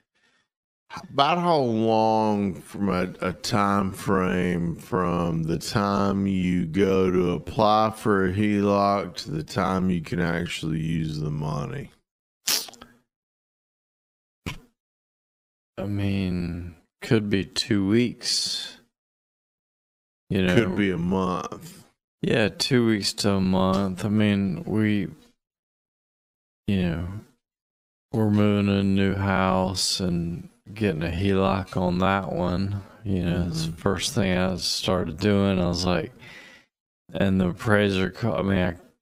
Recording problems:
wrong speed, natural pitch; too slow; 0.5 times normal speed

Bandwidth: 15.5 kHz